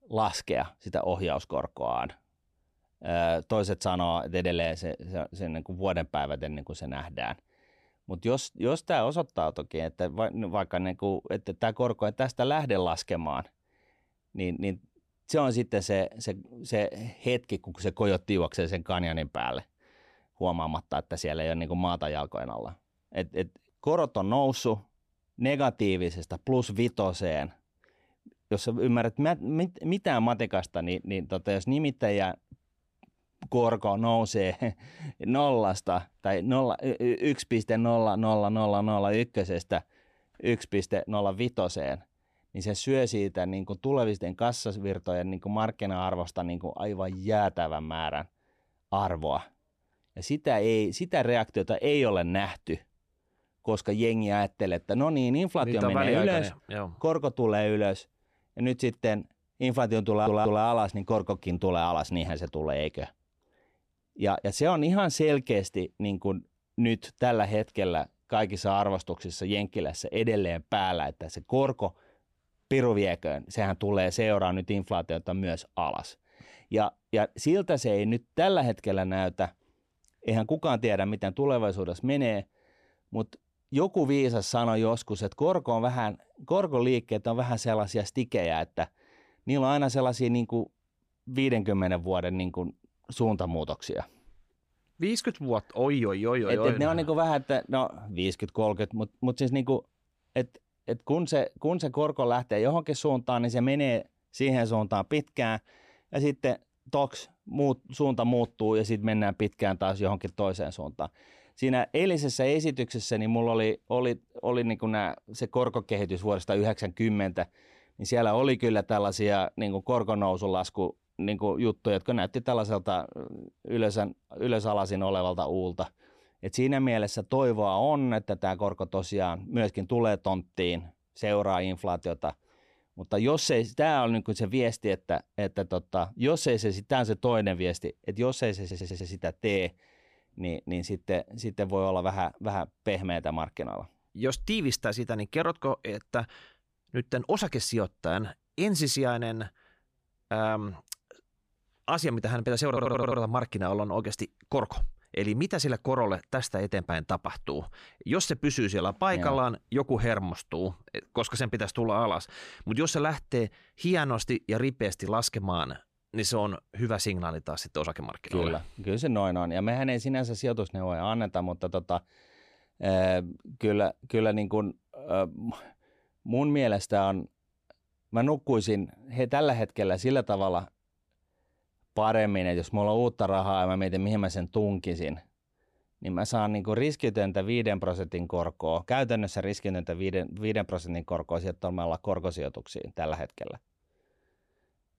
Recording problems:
audio stuttering; at 1:00, at 2:19 and at 2:33

